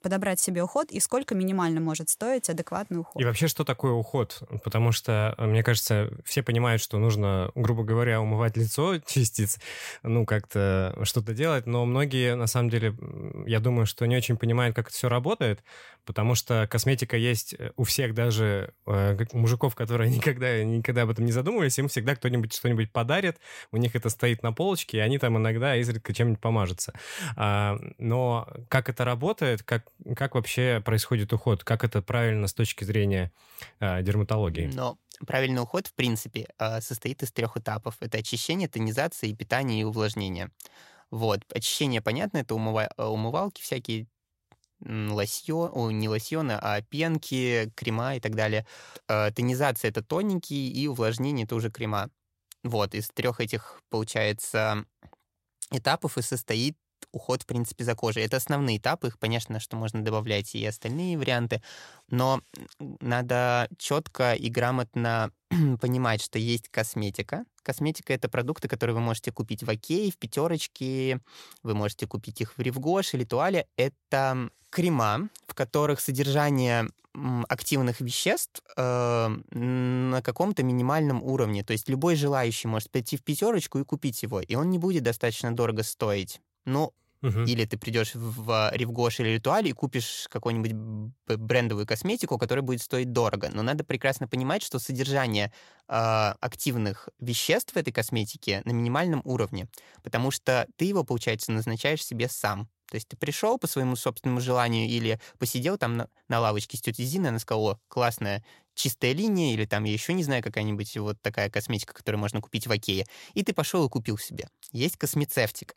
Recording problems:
none

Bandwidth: 16 kHz